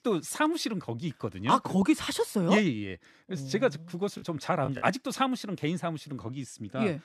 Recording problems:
choppy; very; at 4 s; 9% of the speech affected

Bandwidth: 13.5 kHz